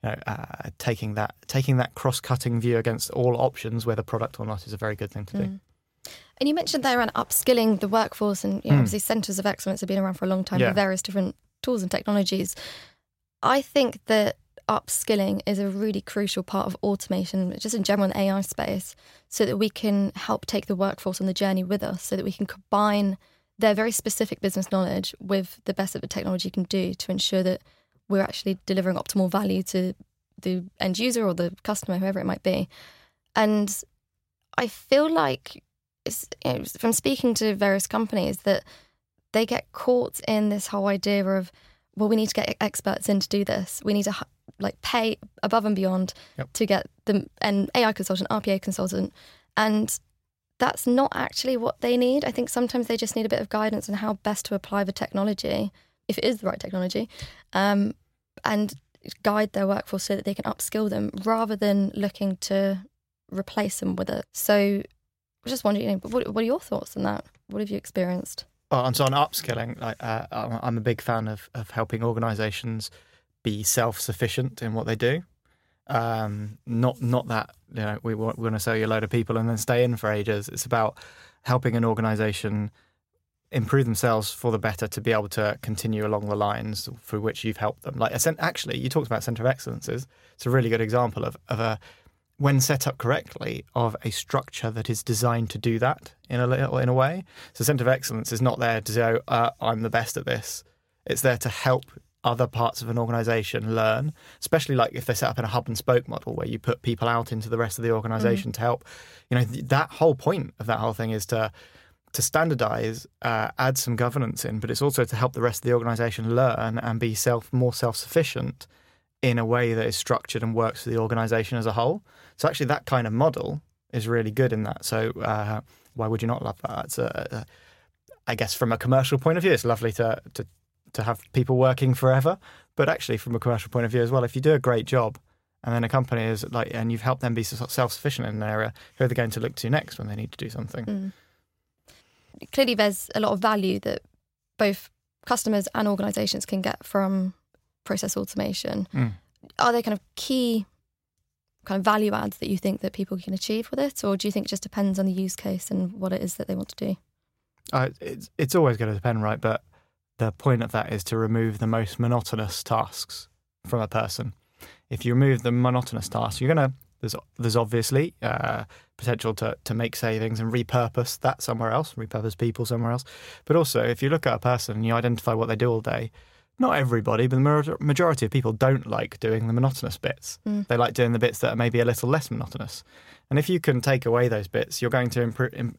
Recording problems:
none

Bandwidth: 16 kHz